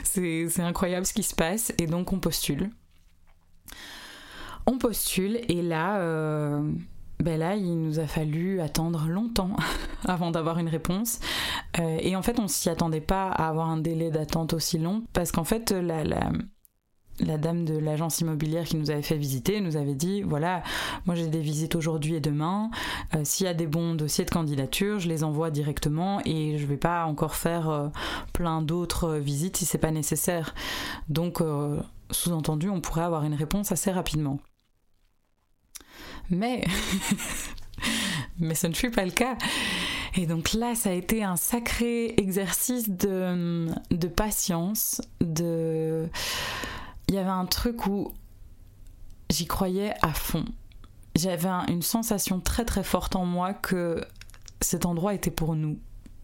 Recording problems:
squashed, flat; heavily

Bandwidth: 16 kHz